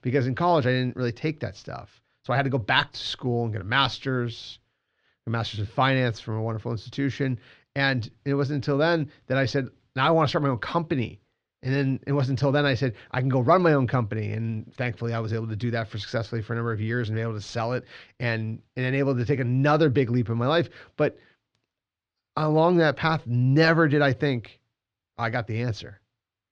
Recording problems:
muffled; slightly; fading above 3.5 kHz

